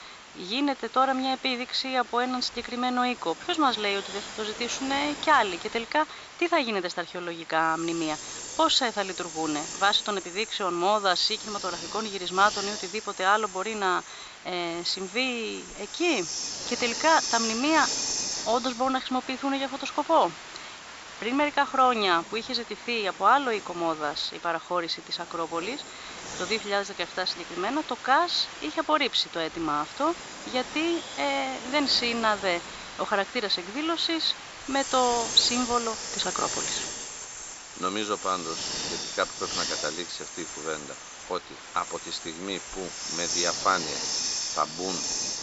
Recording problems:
thin; somewhat; fading below 400 Hz
high frequencies cut off; noticeable; nothing above 8 kHz
hiss; loud; throughout; 7 dB below the speech

